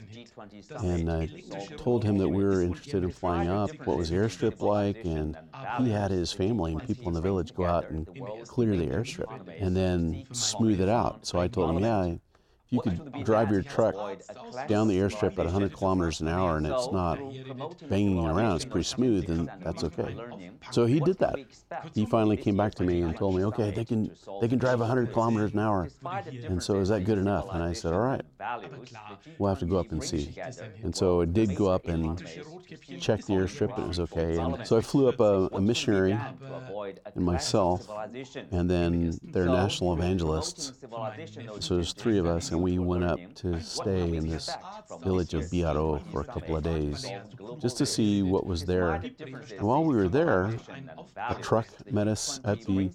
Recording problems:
background chatter; noticeable; throughout; 2 voices, 10 dB below the speech

